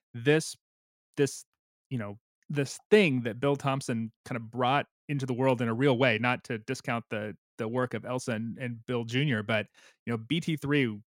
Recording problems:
none

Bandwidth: 16 kHz